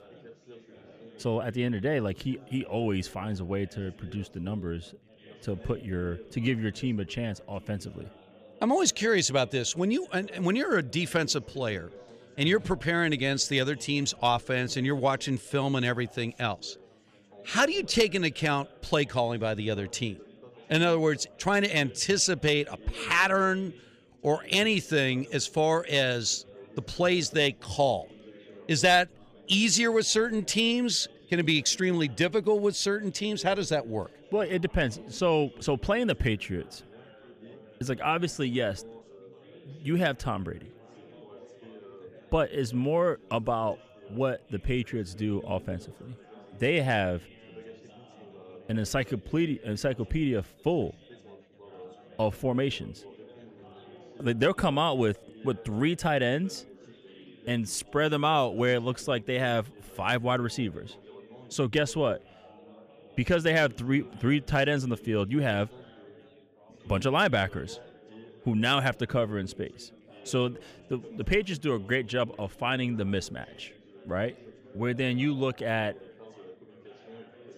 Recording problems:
background chatter; faint; throughout; 4 voices, 25 dB below the speech

